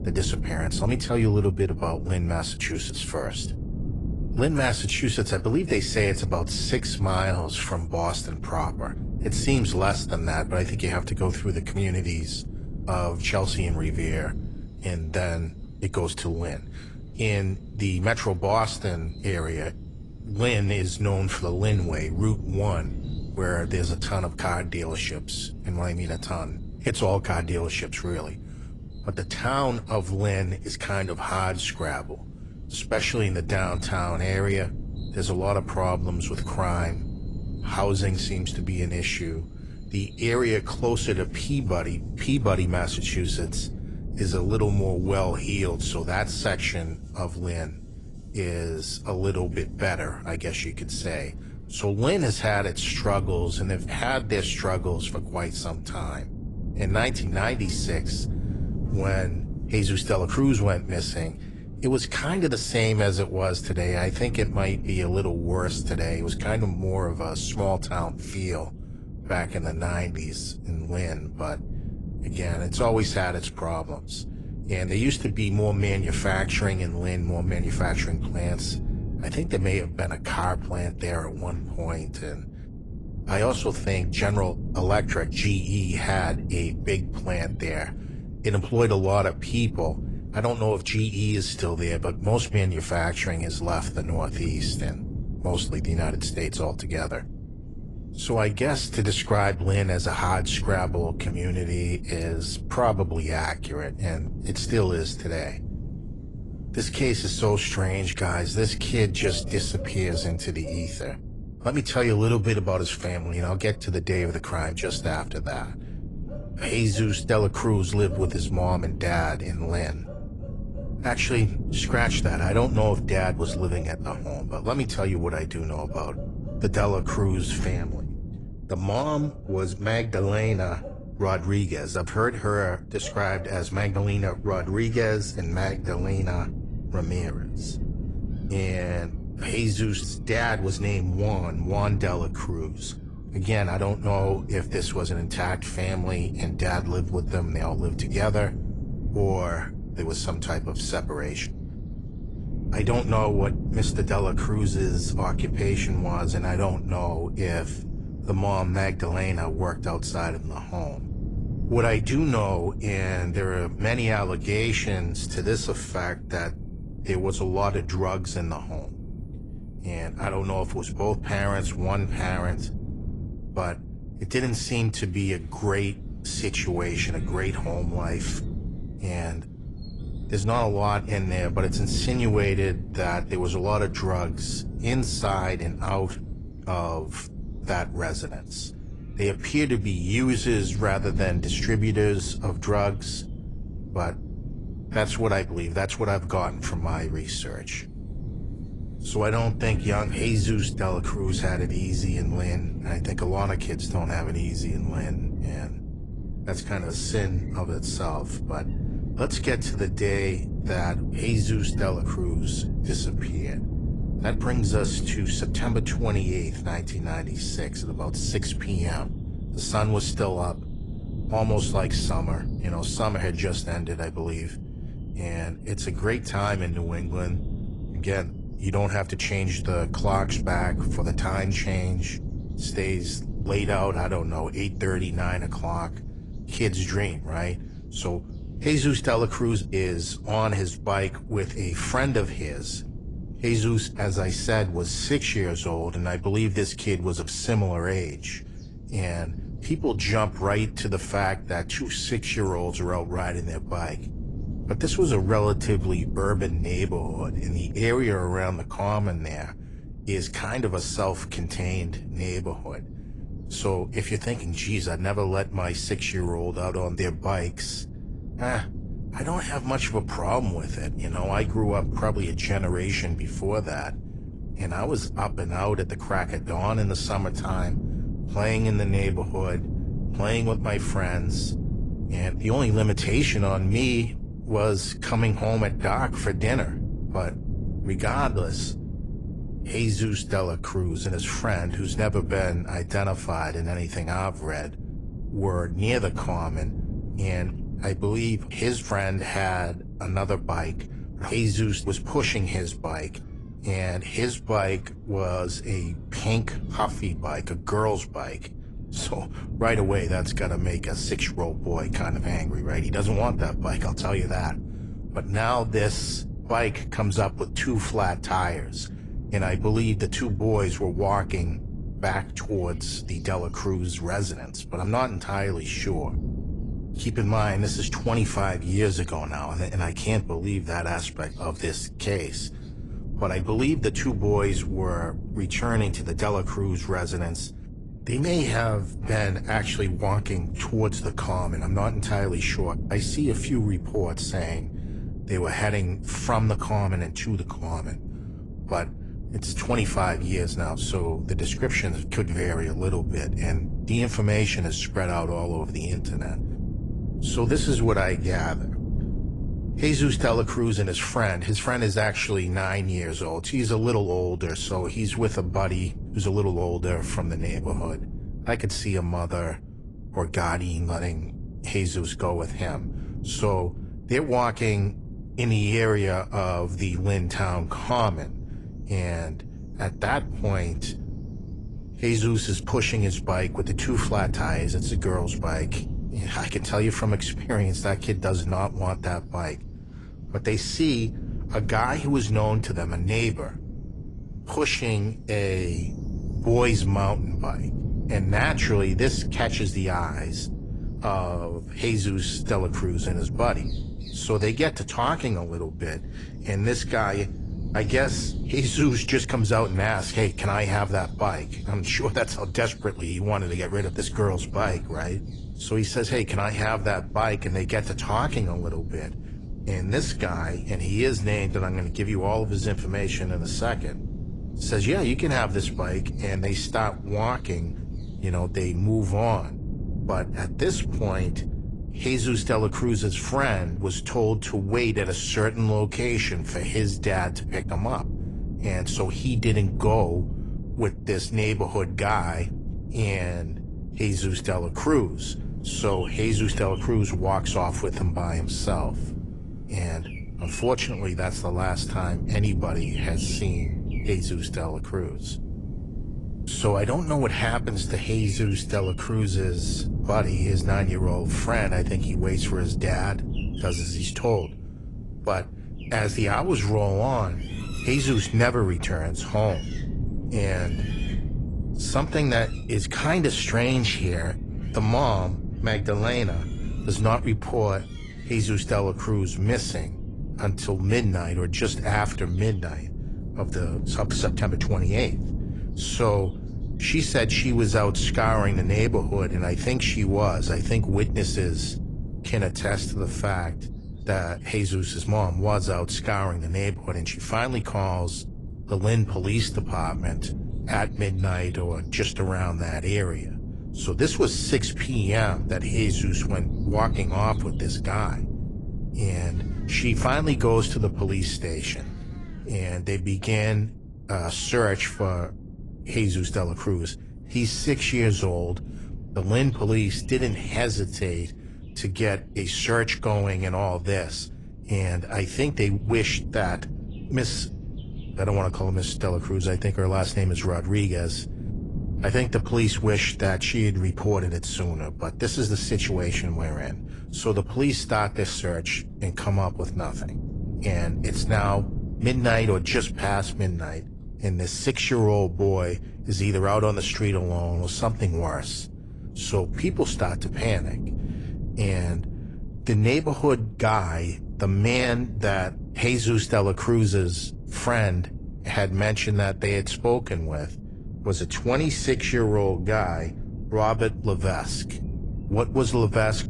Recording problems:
garbled, watery; slightly; nothing above 10 kHz
wind noise on the microphone; occasional gusts; 15 dB below the speech
animal sounds; faint; throughout; 25 dB below the speech

